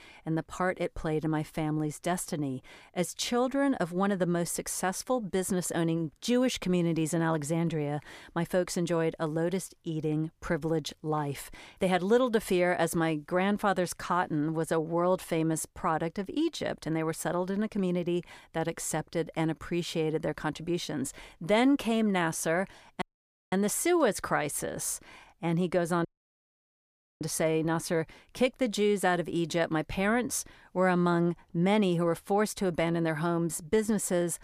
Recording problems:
audio cutting out; at 23 s for 0.5 s and at 26 s for 1 s

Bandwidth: 15 kHz